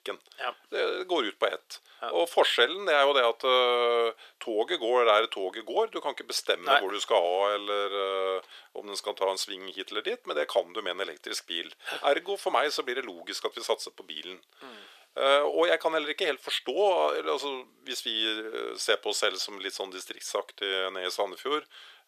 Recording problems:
thin; very; fading below 400 Hz

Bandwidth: 14.5 kHz